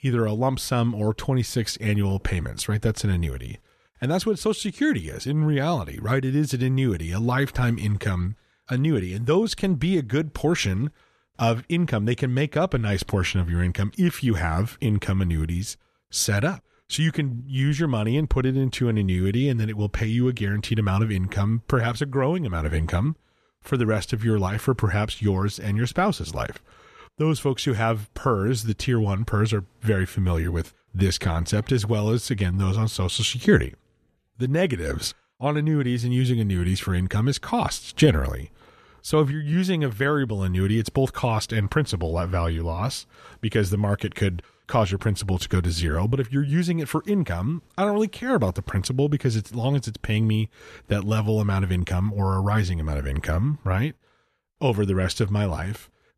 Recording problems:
none

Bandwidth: 14 kHz